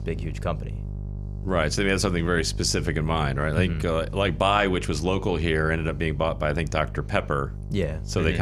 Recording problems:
electrical hum; faint; throughout; 50 Hz, 20 dB below the speech
abrupt cut into speech; at the end

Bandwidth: 14.5 kHz